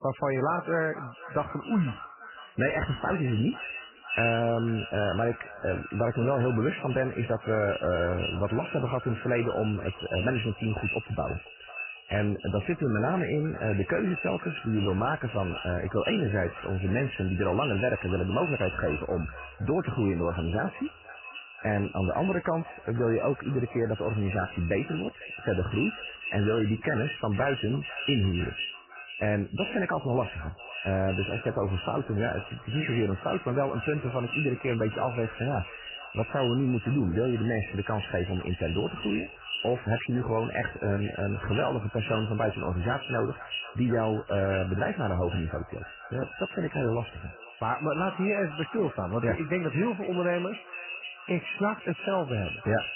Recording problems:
echo of what is said; strong; throughout; 500 ms later, 10 dB below the speech
garbled, watery; badly; nothing above 3 kHz

